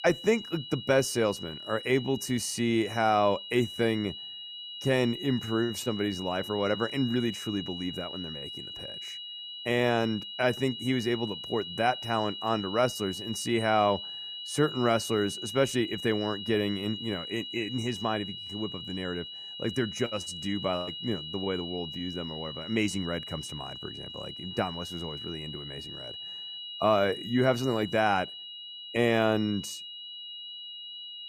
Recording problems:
high-pitched whine; loud; throughout; 3 kHz, 8 dB below the speech

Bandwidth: 14.5 kHz